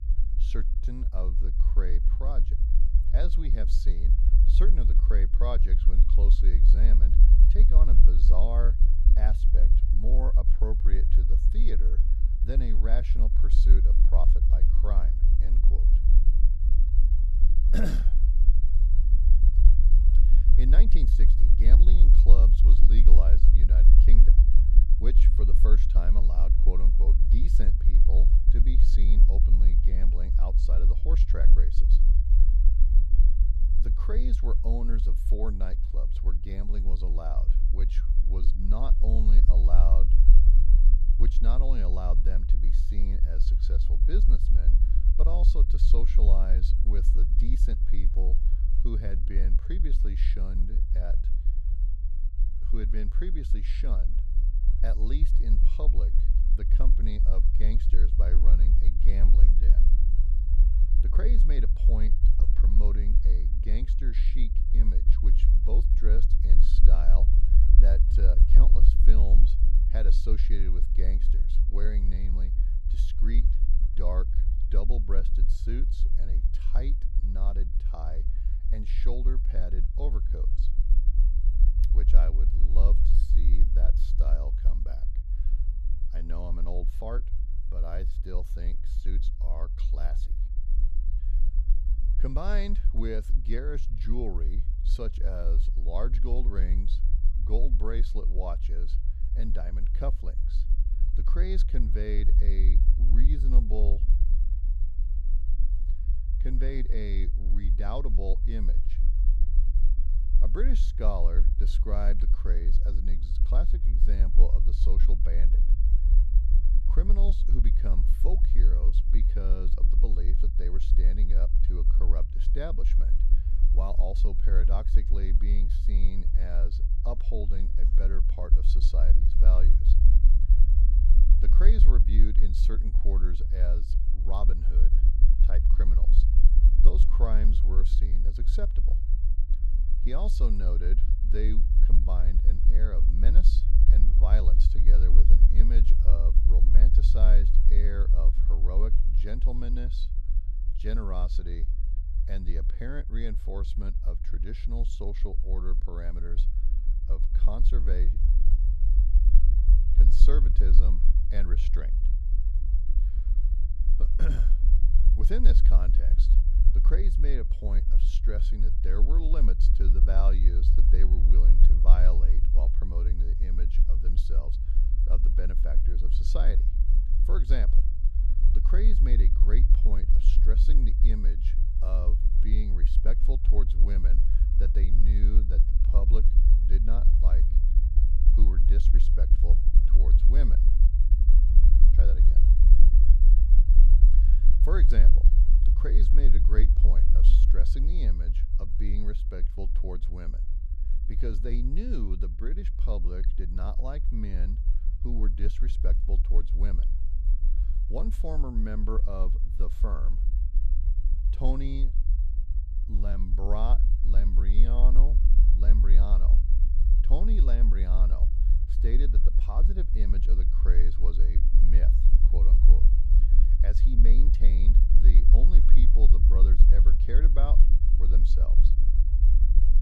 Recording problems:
low rumble; loud; throughout; 6 dB below the speech

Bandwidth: 14.5 kHz